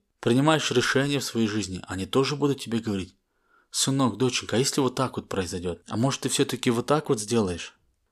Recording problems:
none

